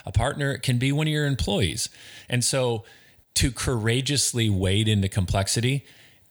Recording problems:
none

